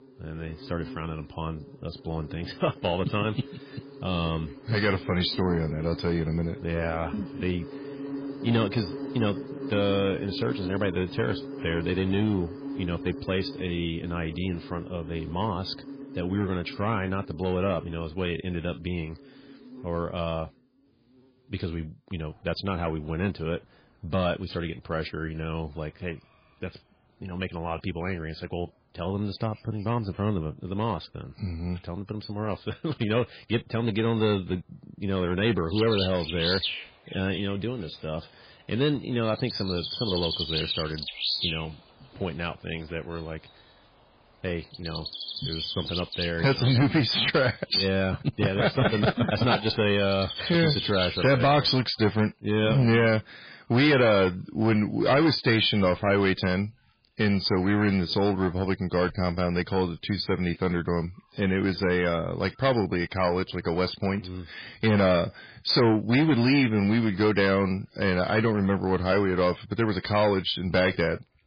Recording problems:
garbled, watery; badly; nothing above 4.5 kHz
distortion; slight; 4% of the sound clipped
animal sounds; loud; throughout; 8 dB below the speech

